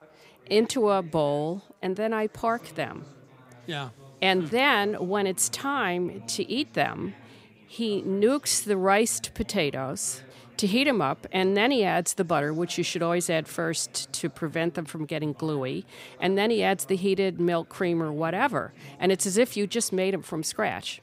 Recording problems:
chatter from many people; faint; throughout; 25 dB below the speech

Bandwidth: 15.5 kHz